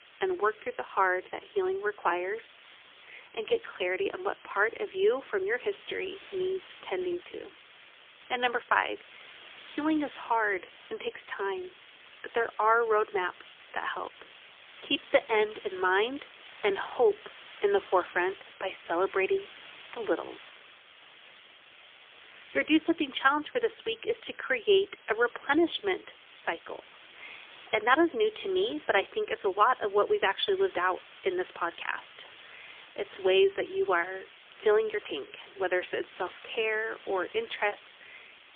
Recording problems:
phone-call audio; poor line; nothing above 3.5 kHz
hiss; faint; throughout; 20 dB below the speech

